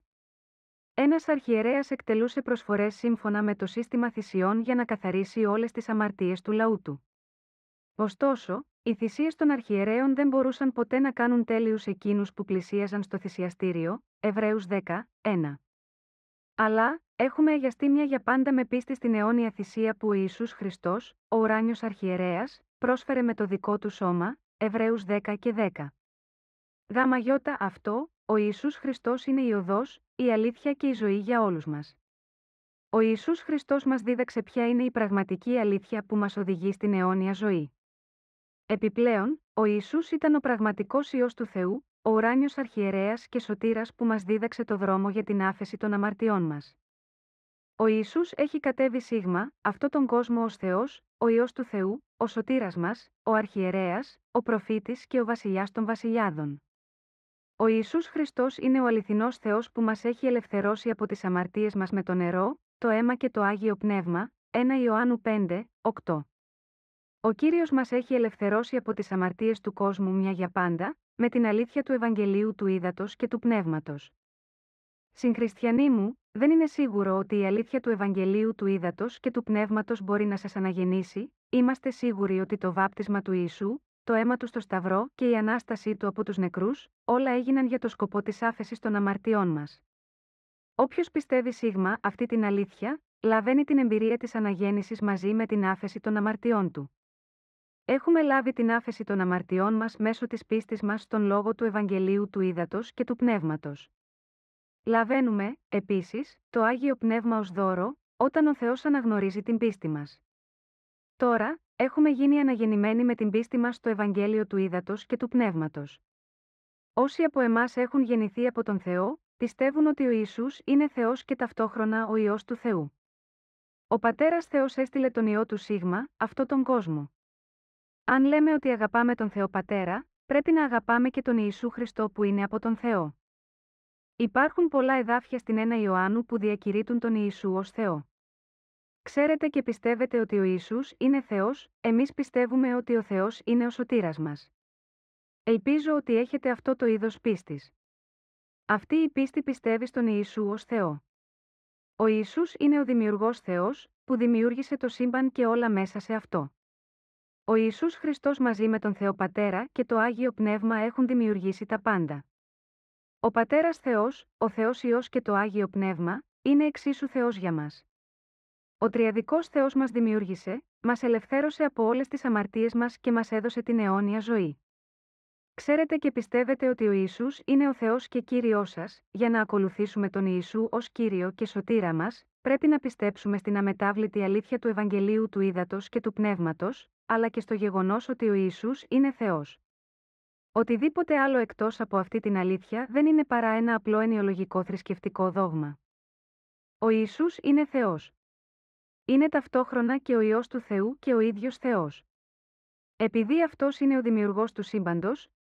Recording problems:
muffled; very; fading above 2 kHz

